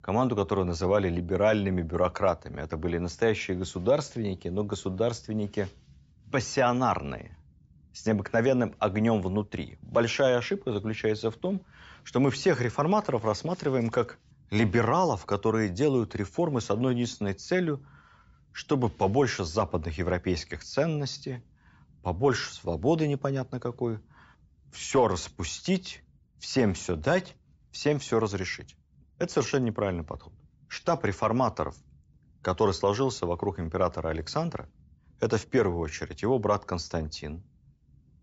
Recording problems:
high frequencies cut off; noticeable; nothing above 8 kHz

